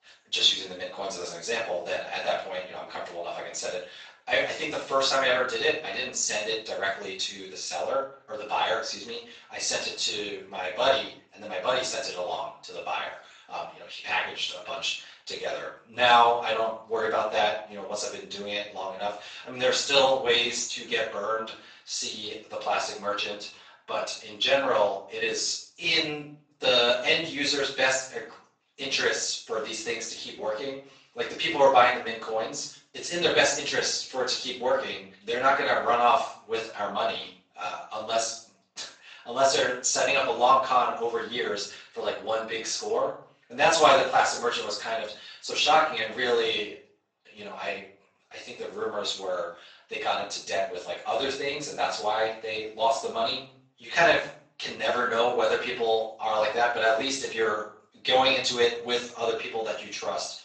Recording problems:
off-mic speech; far
room echo; noticeable; dies away in 0.5 s
thin; somewhat; fading below 500 Hz
garbled, watery; slightly; nothing above 7.5 kHz

